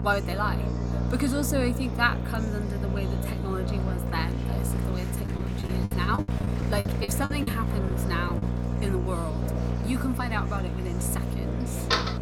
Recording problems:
electrical hum; loud; throughout; 60 Hz, 7 dB below the speech
murmuring crowd; loud; throughout; 9 dB below the speech
choppy; very; from 5.5 to 8.5 s; 15% of the speech affected
door banging; loud; at 12 s; peak 5 dB above the speech

